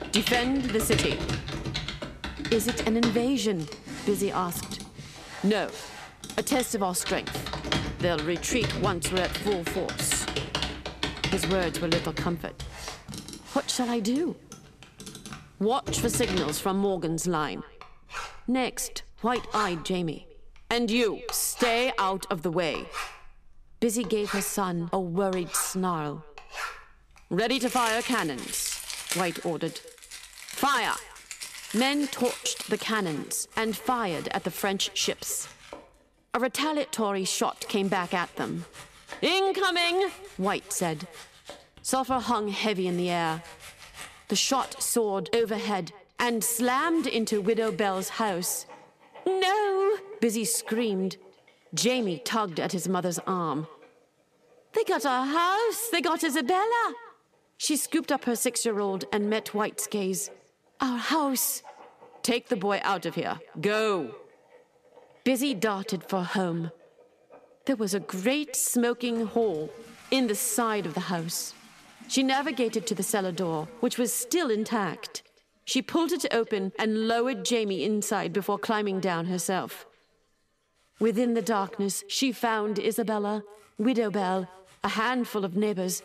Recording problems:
echo of what is said; faint; throughout; 220 ms later, 20 dB below the speech
household noises; loud; throughout; 8 dB below the speech

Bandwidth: 14.5 kHz